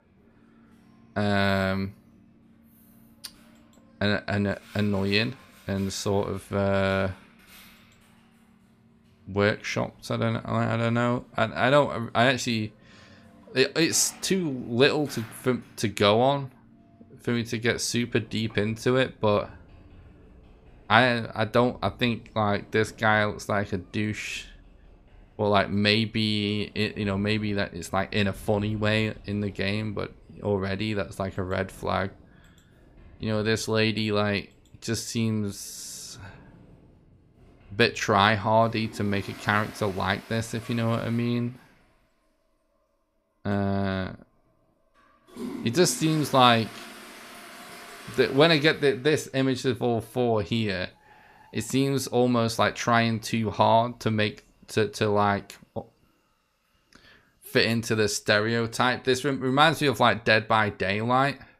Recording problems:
household noises; faint; throughout; 25 dB below the speech

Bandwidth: 15 kHz